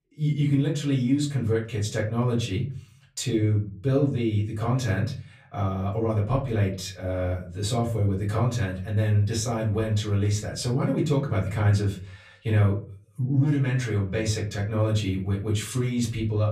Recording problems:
off-mic speech; far
room echo; slight; dies away in 0.4 s

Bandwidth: 15 kHz